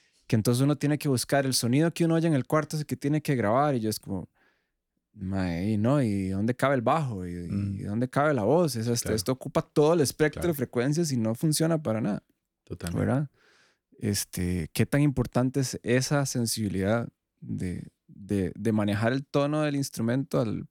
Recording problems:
none

